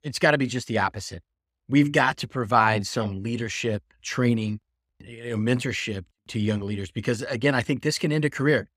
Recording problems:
none

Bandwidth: 15.5 kHz